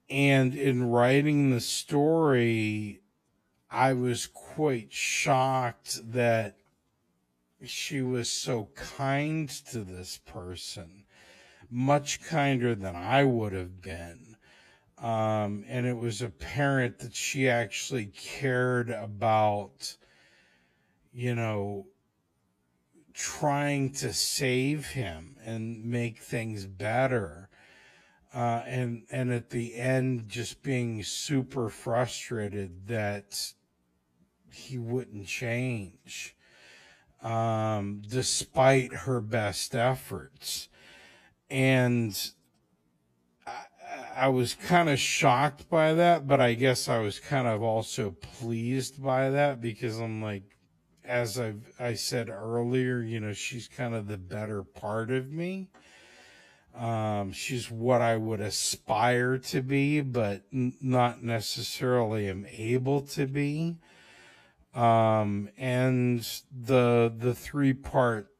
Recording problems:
wrong speed, natural pitch; too slow; 0.6 times normal speed

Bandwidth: 14.5 kHz